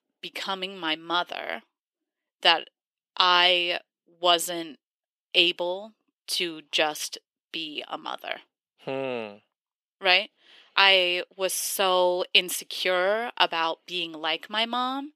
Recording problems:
thin; very; fading below 350 Hz

